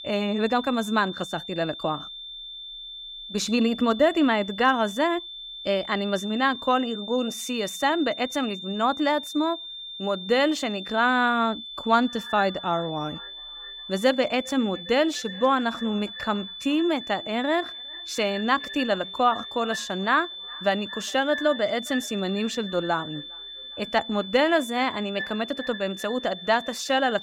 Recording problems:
echo of what is said; noticeable; from 12 s on; 410 ms later, 15 dB below the speech
high-pitched whine; noticeable; throughout; 3.5 kHz, 10 dB below the speech

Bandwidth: 16 kHz